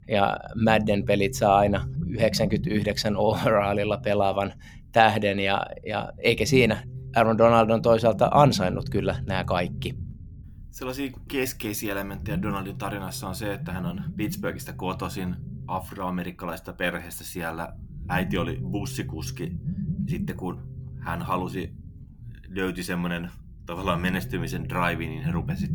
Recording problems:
low rumble; noticeable; throughout; 20 dB below the speech

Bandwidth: 18.5 kHz